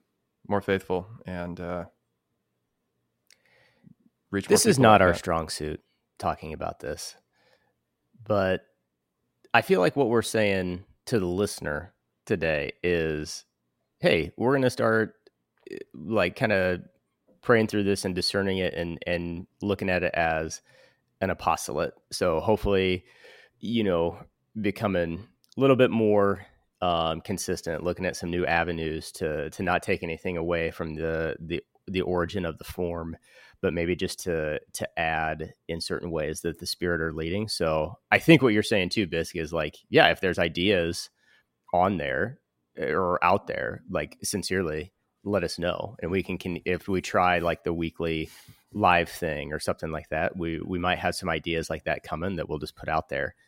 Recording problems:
none

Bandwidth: 16 kHz